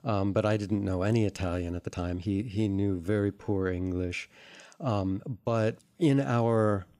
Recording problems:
uneven, jittery; strongly; from 2 to 5.5 s

